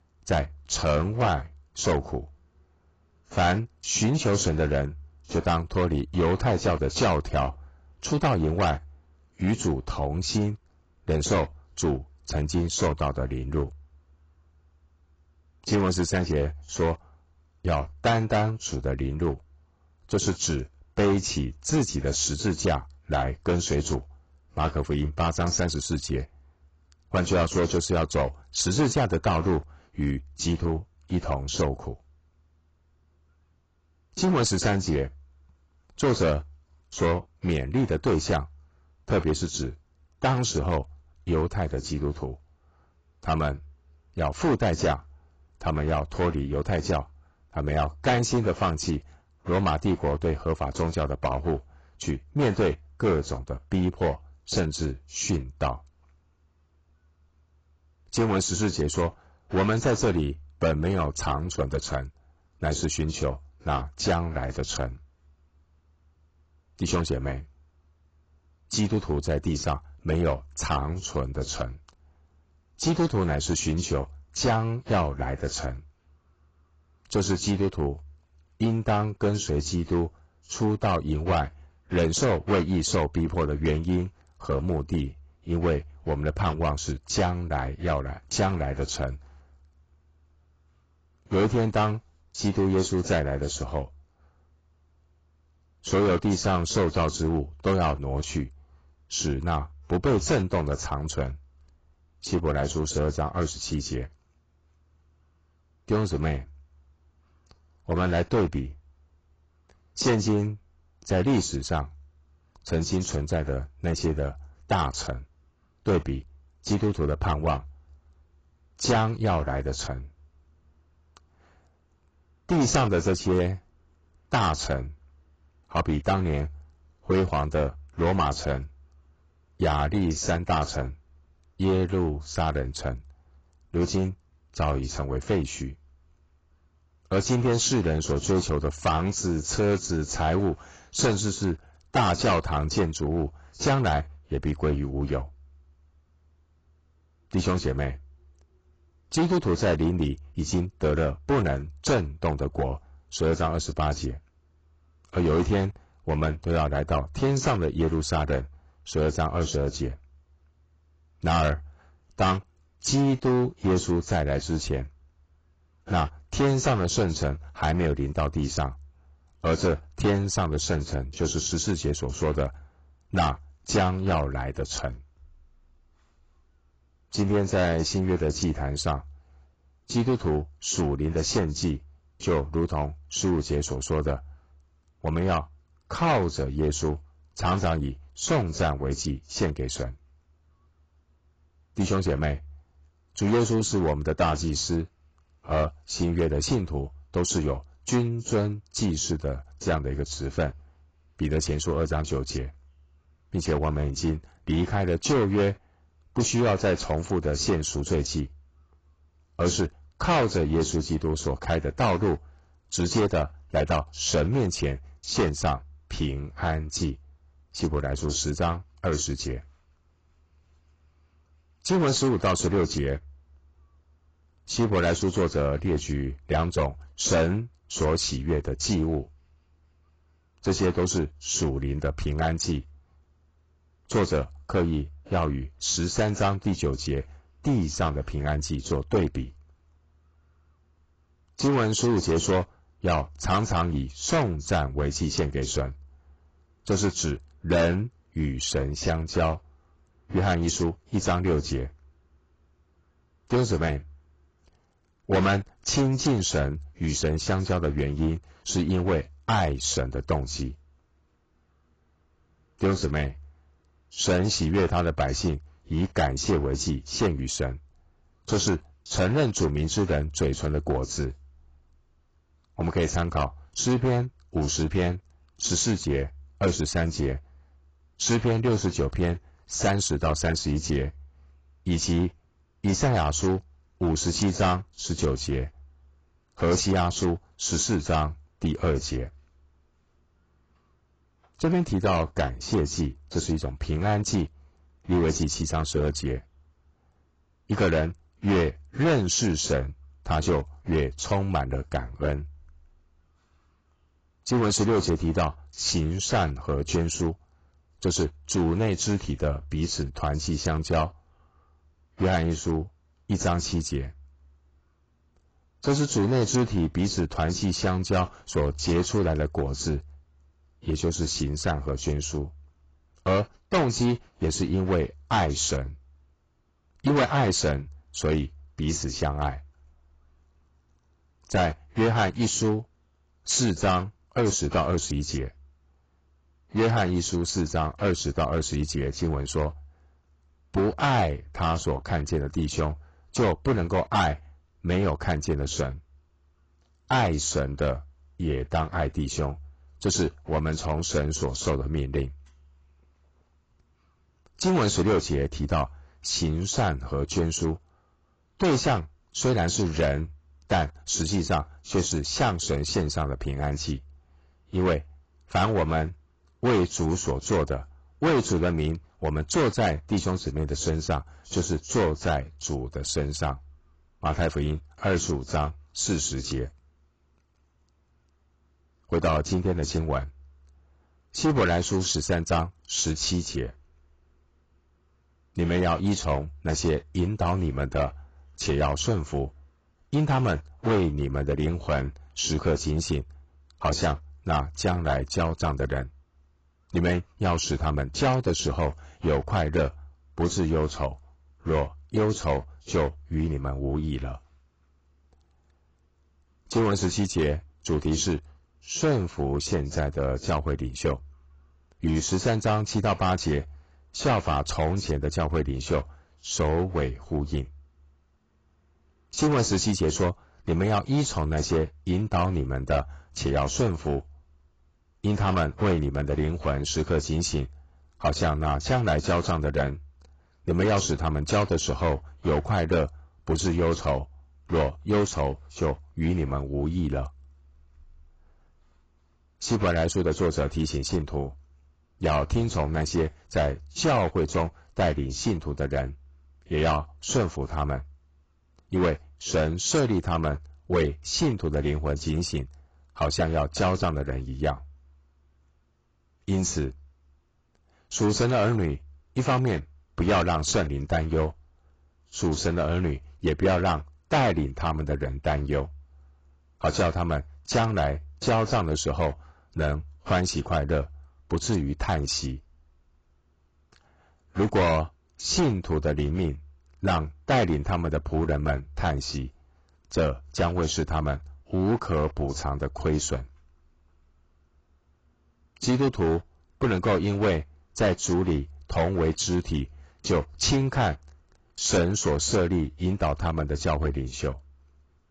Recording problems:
distortion; heavy; 6% of the sound clipped
garbled, watery; badly; nothing above 7.5 kHz

